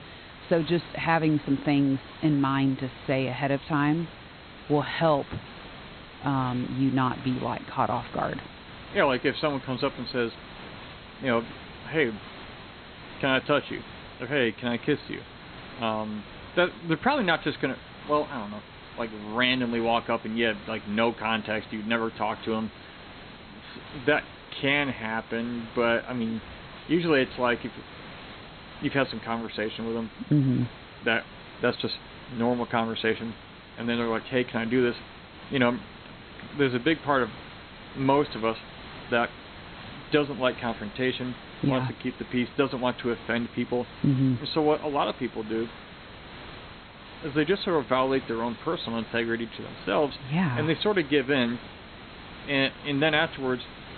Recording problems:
high frequencies cut off; severe; nothing above 4 kHz
hiss; noticeable; throughout; 15 dB below the speech

